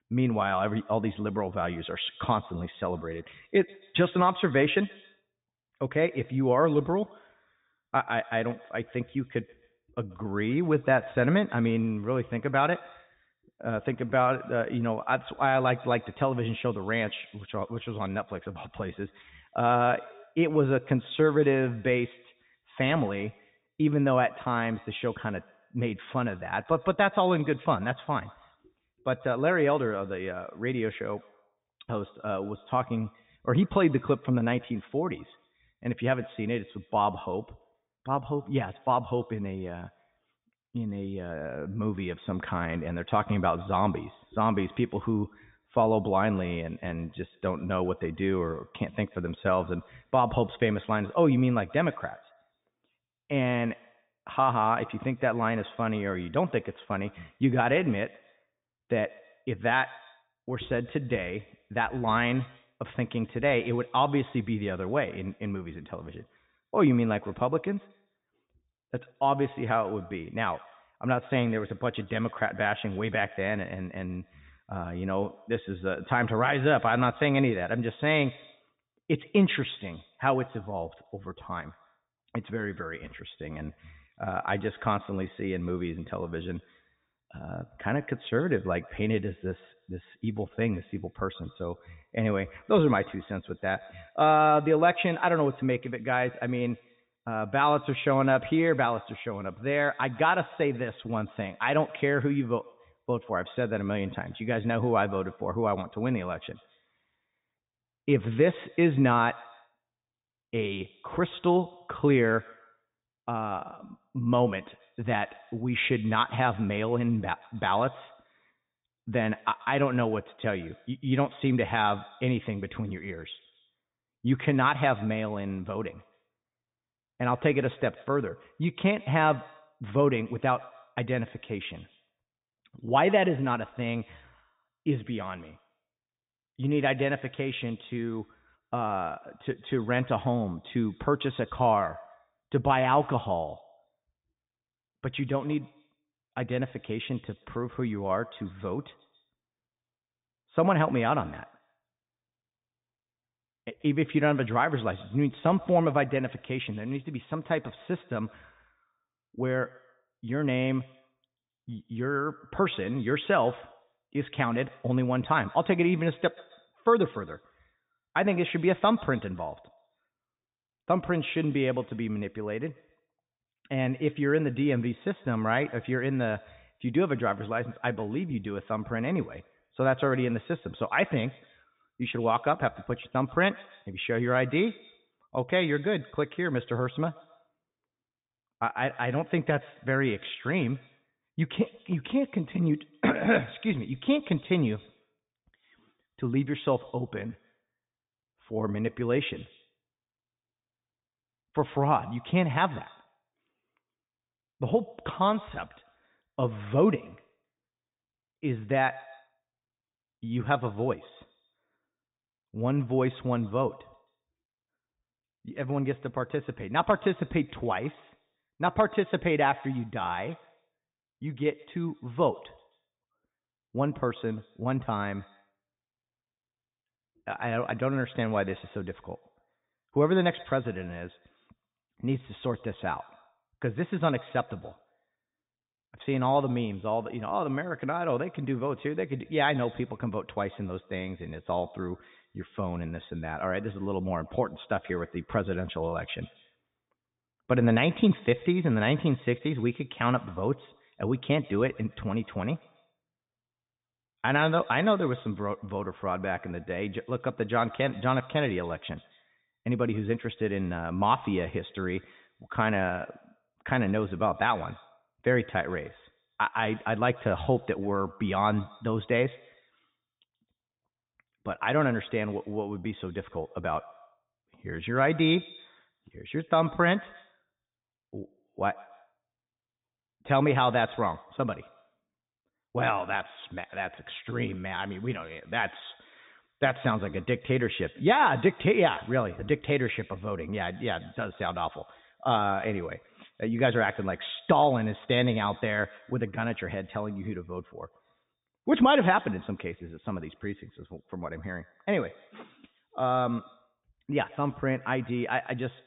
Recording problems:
high frequencies cut off; severe; nothing above 3.5 kHz
echo of what is said; faint; throughout; 130 ms later, 25 dB below the speech

